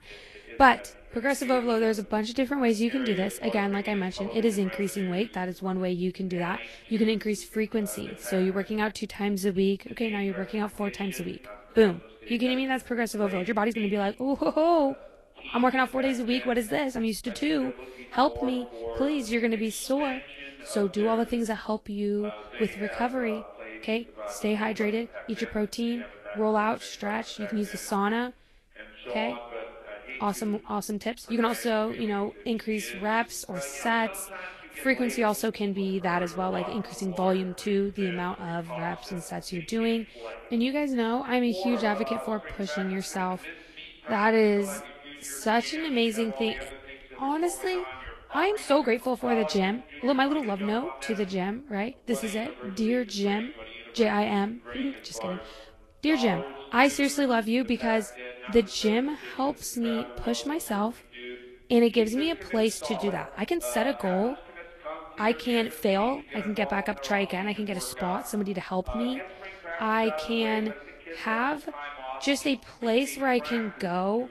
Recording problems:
garbled, watery; slightly; nothing above 12.5 kHz
voice in the background; noticeable; throughout; 10 dB below the speech
uneven, jittery; strongly; from 9 s to 1:06

